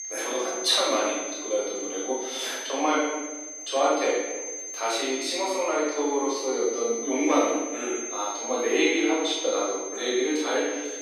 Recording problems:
room echo; strong; dies away in 1 s
off-mic speech; far
thin; somewhat; fading below 300 Hz
high-pitched whine; loud; throughout; 6 kHz, 8 dB below the speech

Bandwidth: 15 kHz